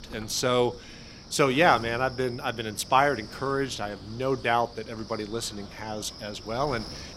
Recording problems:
wind noise on the microphone; occasional gusts; 20 dB below the speech

